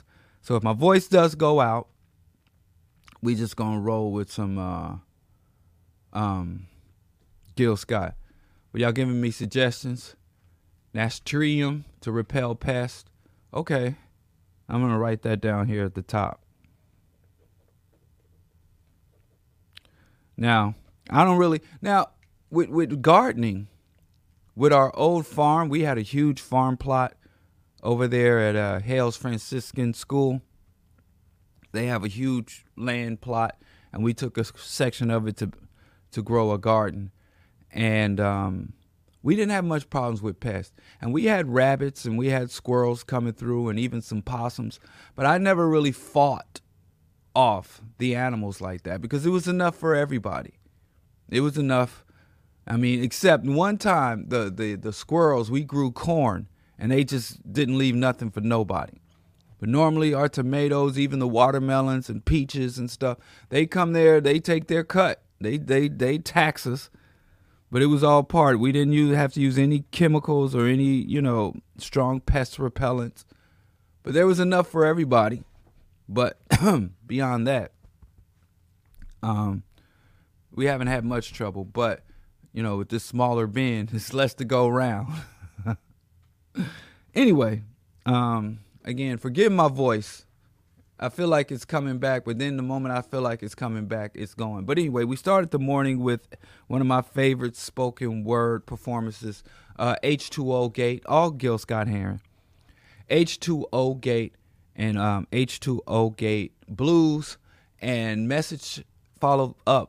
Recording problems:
none

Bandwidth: 15 kHz